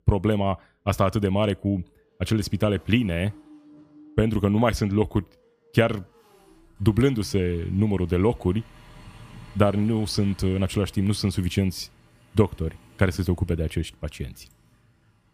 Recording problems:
traffic noise; faint; throughout; 25 dB below the speech

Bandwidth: 15 kHz